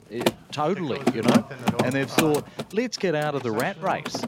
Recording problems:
machinery noise; very loud; throughout; 1 dB above the speech
voice in the background; noticeable; throughout; 10 dB below the speech

